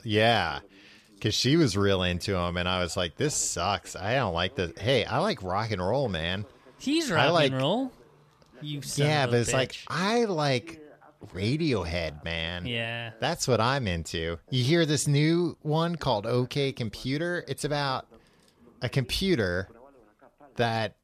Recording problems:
voice in the background; faint; throughout; 25 dB below the speech

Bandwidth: 14 kHz